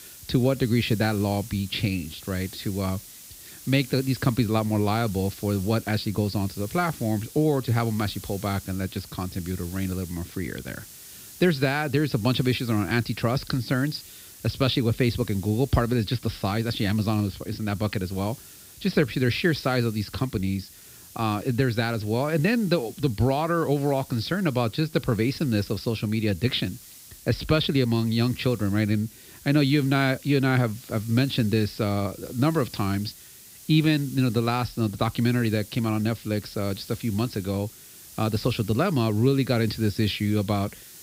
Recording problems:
high frequencies cut off; noticeable; nothing above 5.5 kHz
hiss; noticeable; throughout; 20 dB below the speech

